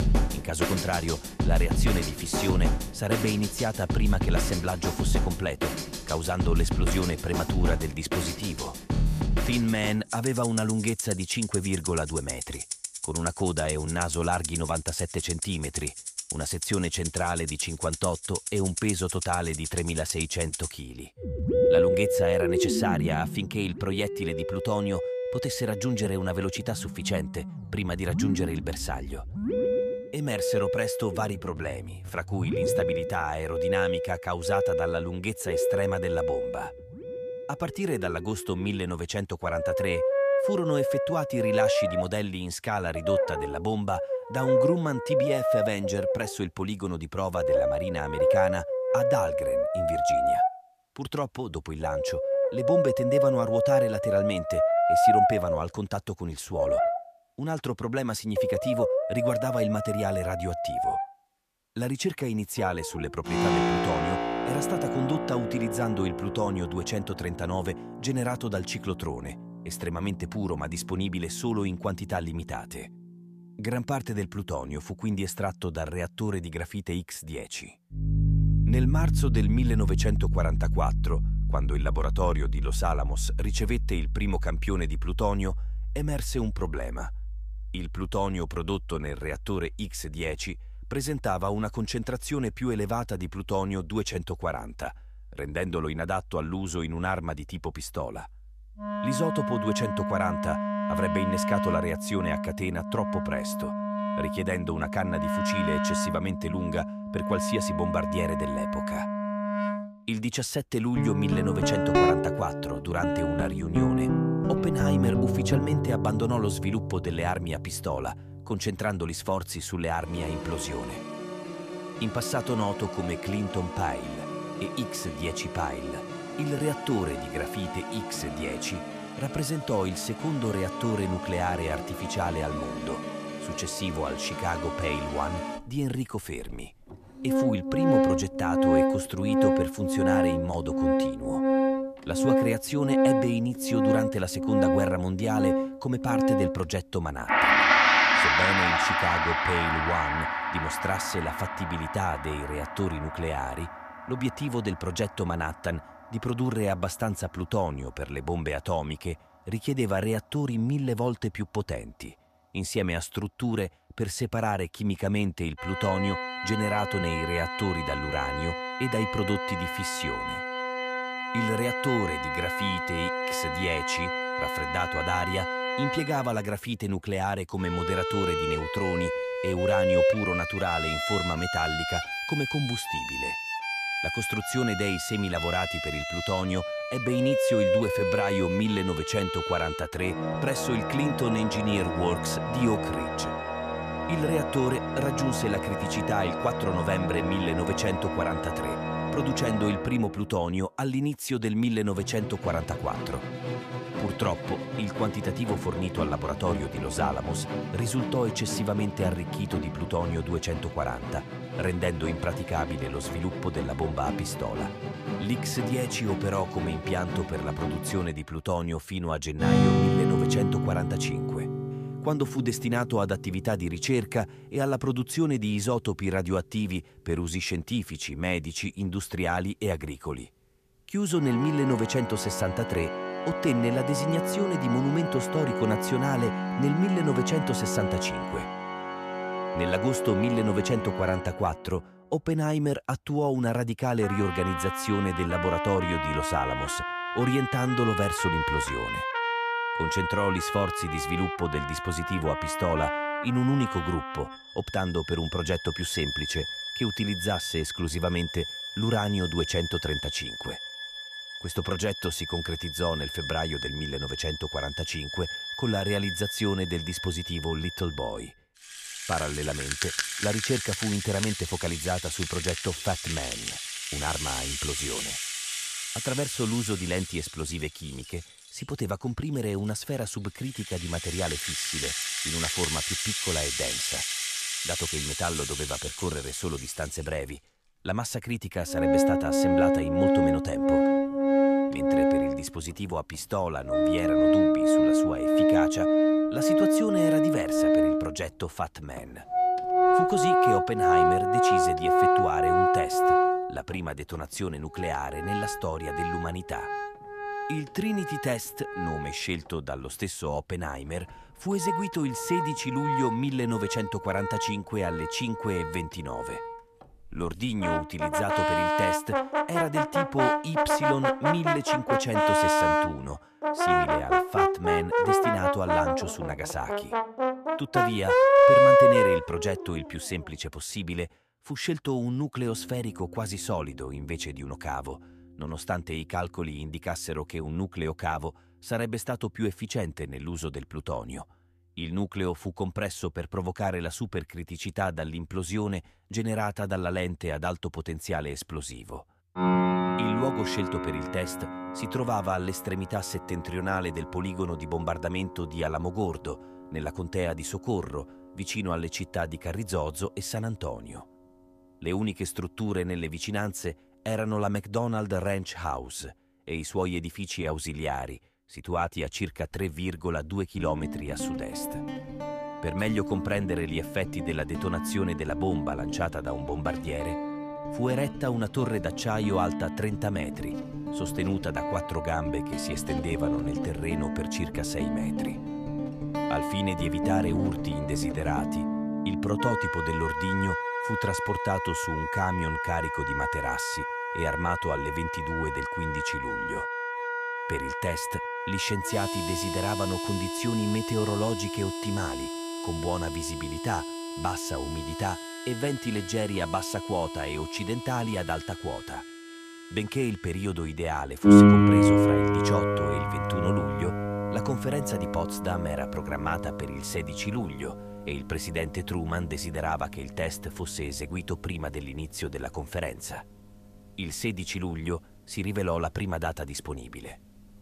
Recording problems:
background music; very loud; throughout; 2 dB above the speech

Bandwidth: 14.5 kHz